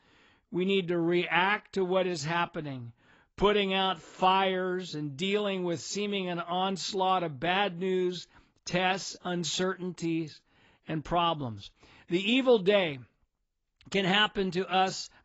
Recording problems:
garbled, watery; badly; nothing above 7.5 kHz

